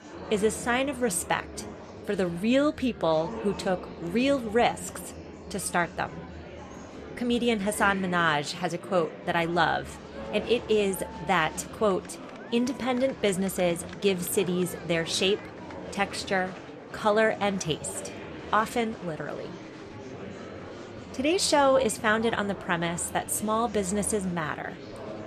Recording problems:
murmuring crowd; noticeable; throughout; 15 dB below the speech

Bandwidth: 13.5 kHz